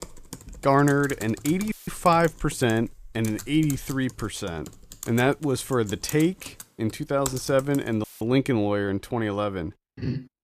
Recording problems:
keyboard typing; noticeable; until 8 s; peak 8 dB below the speech
audio cutting out; filled with static; at 1.5 s and at 8 s

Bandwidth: 14.5 kHz